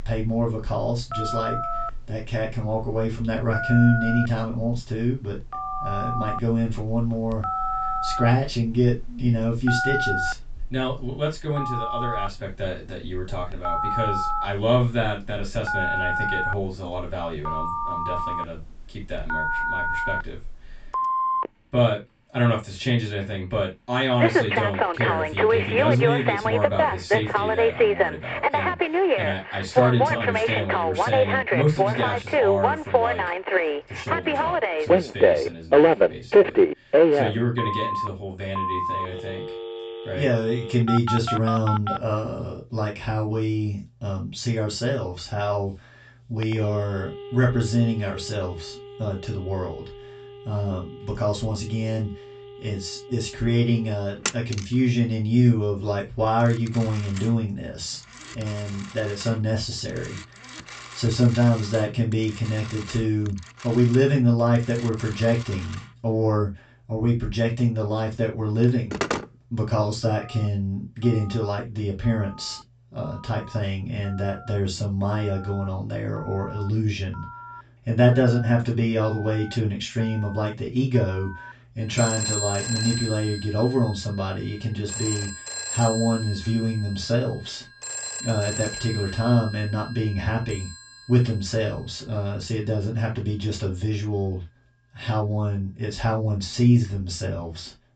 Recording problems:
off-mic speech; far
high frequencies cut off; noticeable; nothing above 8 kHz
room echo; slight; dies away in 0.2 s
alarms or sirens; very loud; throughout; as loud as the speech

